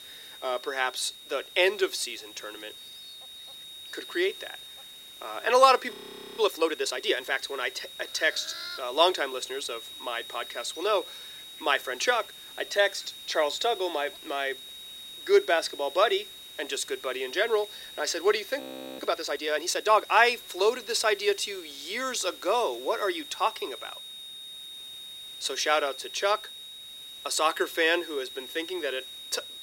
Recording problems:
thin; very; fading below 350 Hz
high-pitched whine; noticeable; throughout; 4 kHz, 15 dB below the speech
animal sounds; faint; throughout; 20 dB below the speech
hiss; faint; throughout; 25 dB below the speech
audio freezing; at 6 s and at 19 s

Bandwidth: 16 kHz